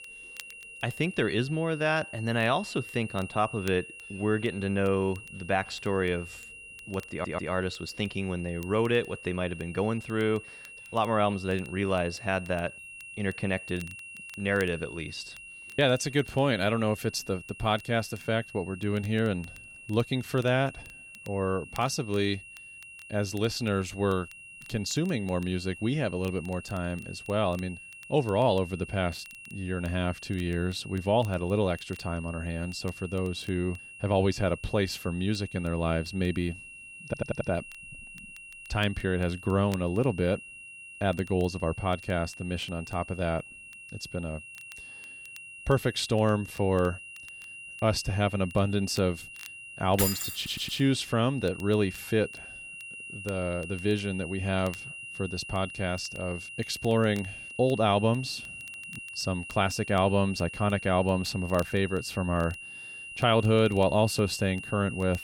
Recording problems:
high-pitched whine; noticeable; throughout; 3 kHz, 15 dB below the speech
crackle, like an old record; faint; 25 dB below the speech
audio stuttering; at 7 s, at 37 s and at 50 s
jangling keys; loud; at 50 s; peak 1 dB above the speech

